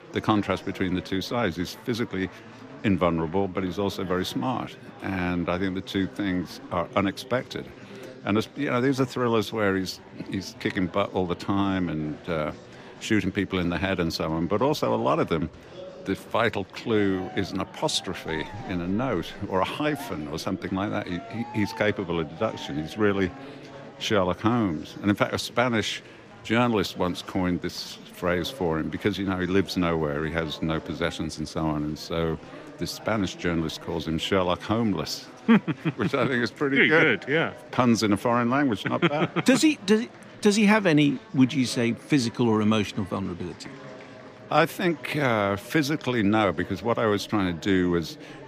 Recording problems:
chatter from many people; noticeable; throughout; 20 dB below the speech

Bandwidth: 15 kHz